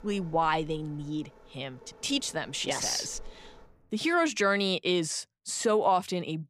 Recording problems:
rain or running water; faint; until 4 s; 25 dB below the speech

